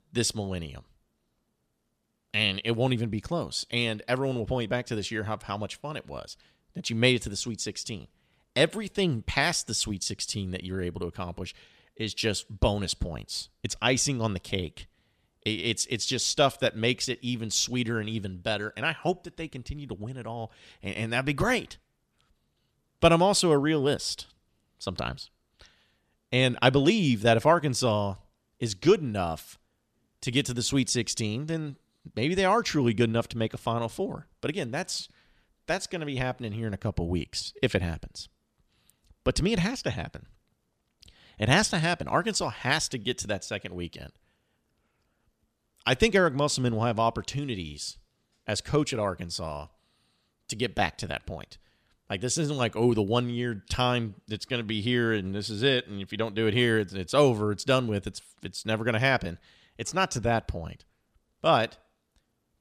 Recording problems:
none

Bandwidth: 14.5 kHz